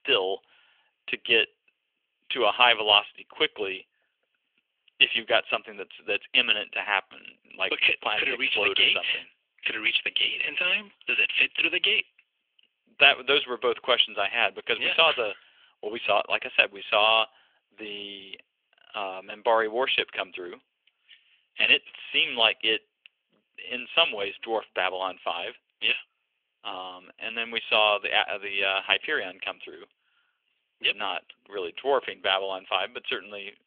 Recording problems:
thin; very; fading below 400 Hz
phone-call audio; nothing above 3.5 kHz

